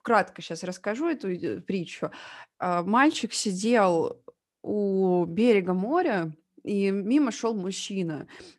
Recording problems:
none

